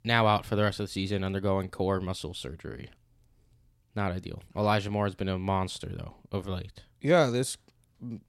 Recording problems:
none

